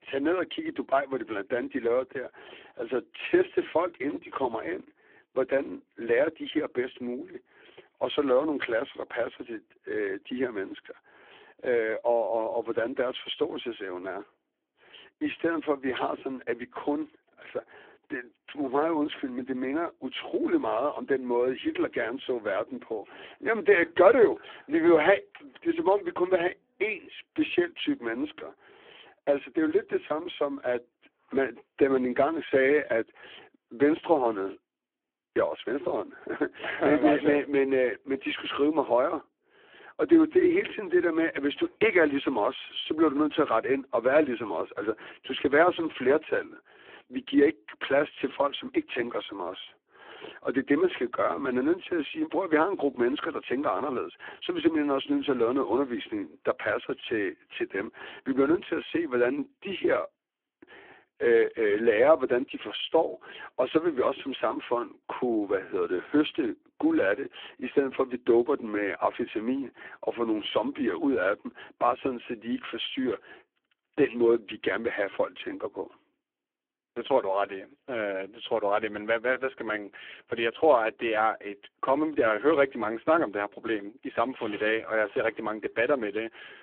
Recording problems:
phone-call audio; poor line

